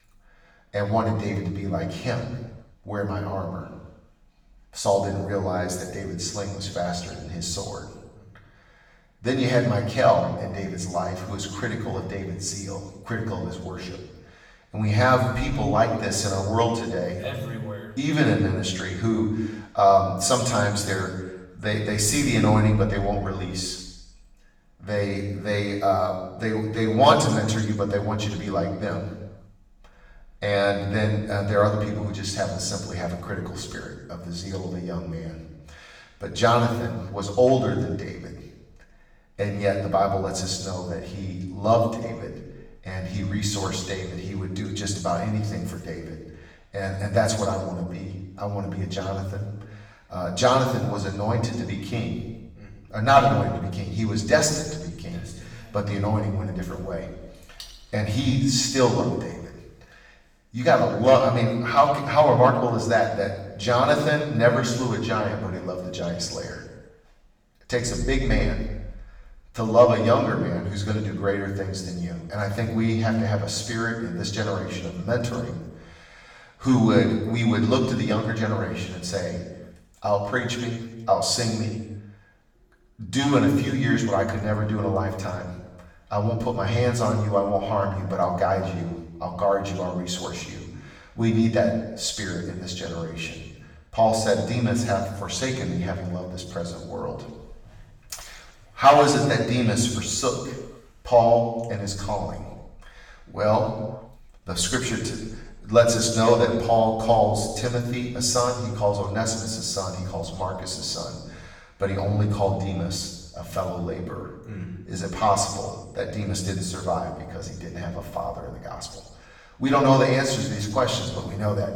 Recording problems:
off-mic speech; far
room echo; noticeable; dies away in 1 s

